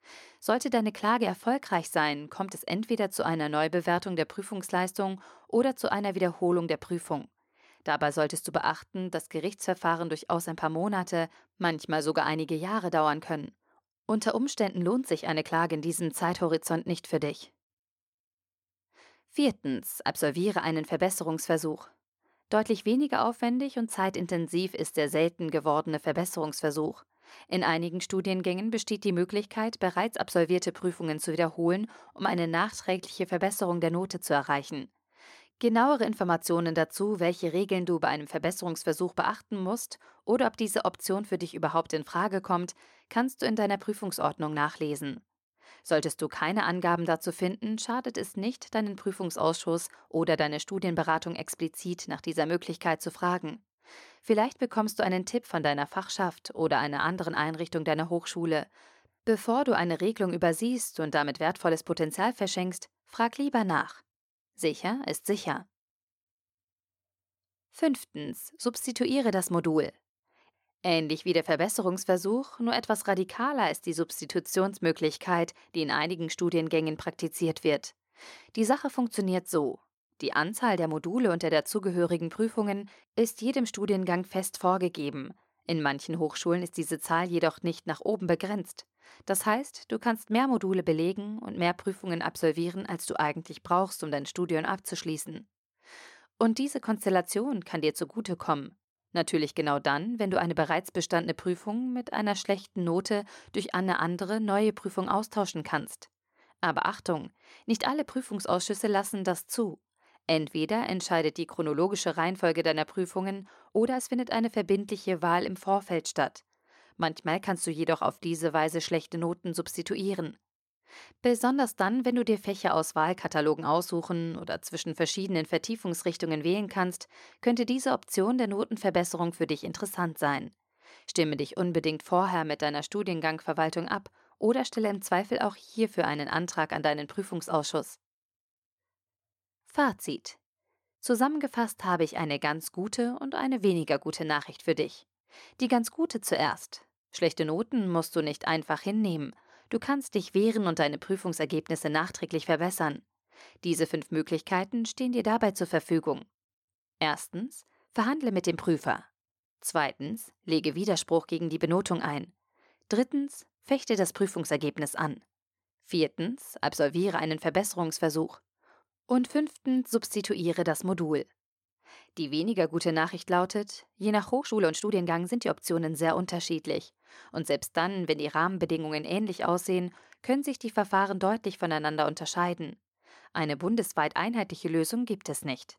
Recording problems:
uneven, jittery; strongly; from 32 s to 2:55

